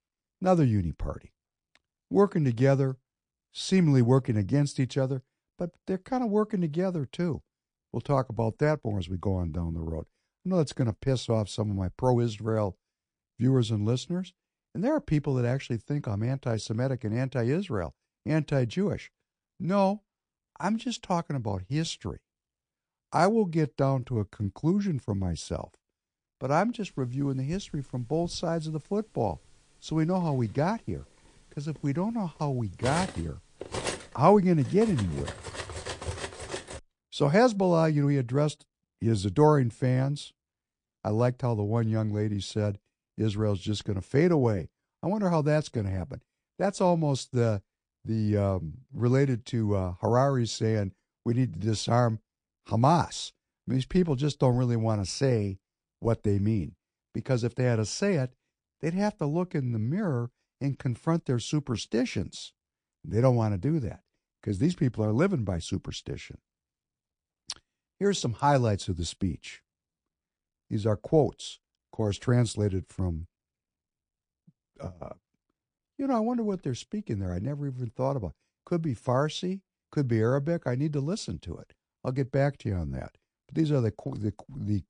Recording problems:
garbled, watery; slightly; nothing above 9 kHz
clattering dishes; noticeable; from 28 to 37 s; peak 5 dB below the speech

